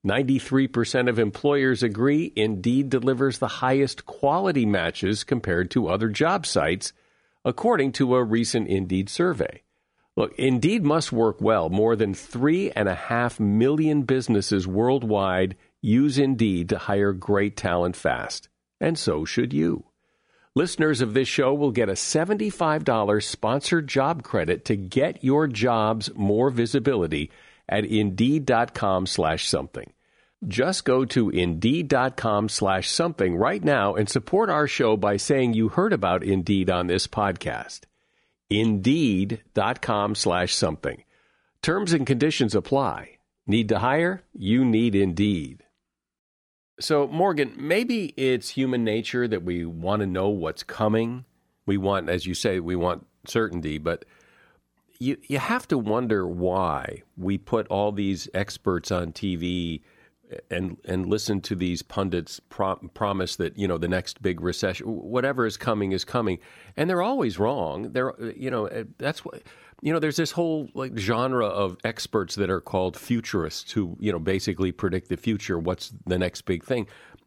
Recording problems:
none

